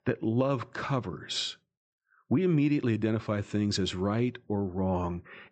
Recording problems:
high frequencies cut off; noticeable; nothing above 8 kHz

